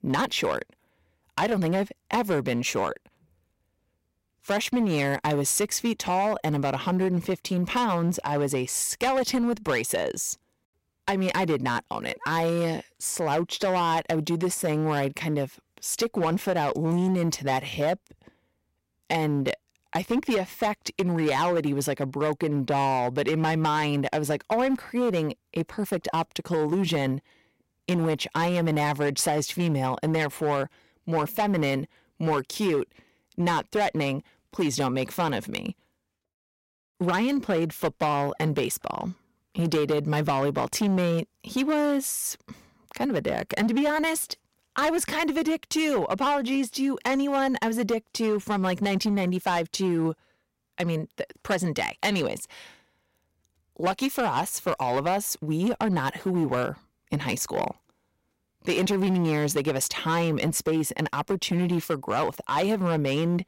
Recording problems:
distortion; slight; 9% of the sound clipped

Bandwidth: 16 kHz